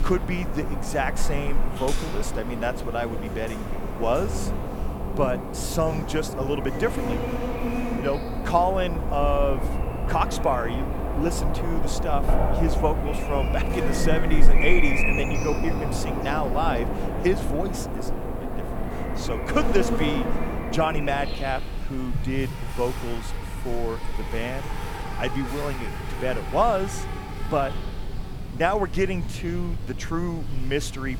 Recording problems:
animal sounds; loud; throughout; 2 dB below the speech

